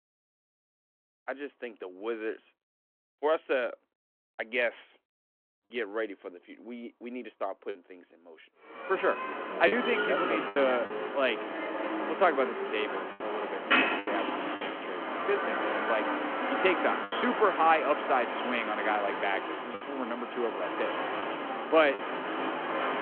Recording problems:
phone-call audio
traffic noise; loud; from 9 s on; 2 dB below the speech
choppy; occasionally; 4% of the speech affected

